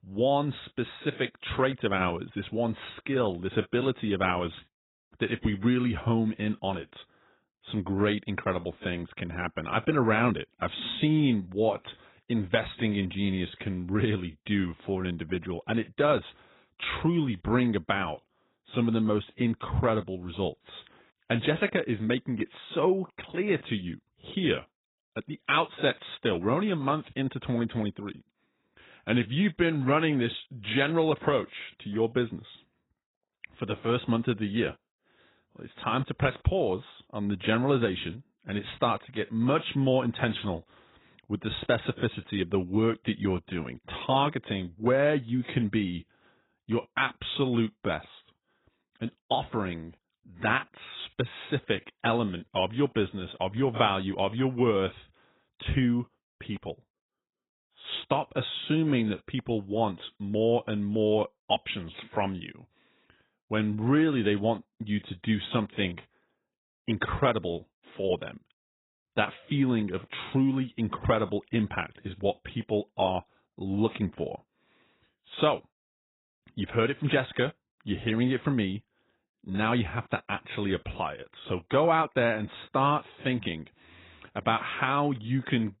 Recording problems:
garbled, watery; badly; nothing above 4 kHz

